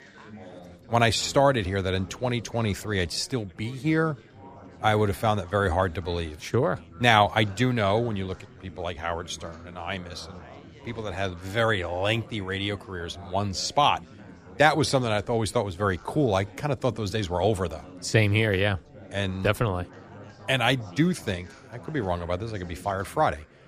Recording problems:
chatter from many people; faint; throughout; 20 dB below the speech

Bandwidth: 15 kHz